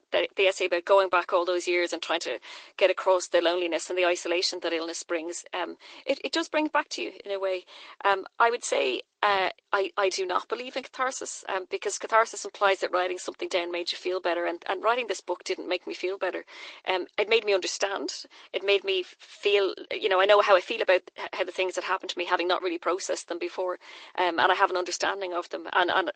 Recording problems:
thin; very; fading below 350 Hz
garbled, watery; slightly; nothing above 8 kHz

